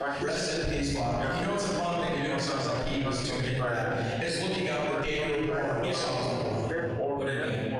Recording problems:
room echo; strong; dies away in 1.9 s
off-mic speech; far
squashed, flat; heavily
voice in the background; loud; throughout; 5 dB below the speech

